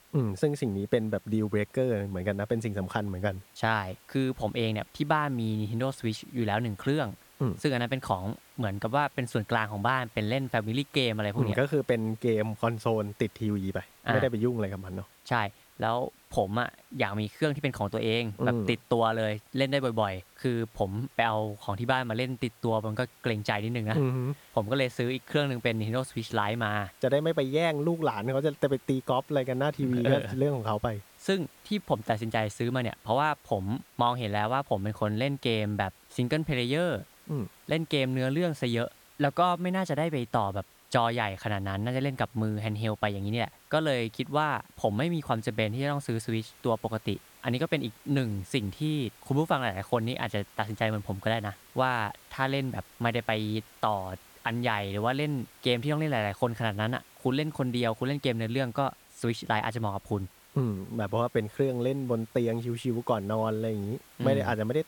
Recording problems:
hiss; faint; throughout; 25 dB below the speech

